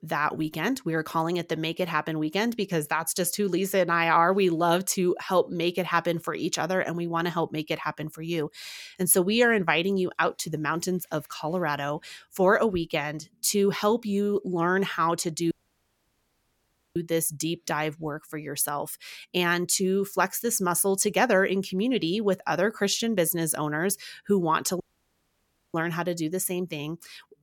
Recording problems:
audio cutting out; at 16 s for 1.5 s and at 25 s for 1 s

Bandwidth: 17 kHz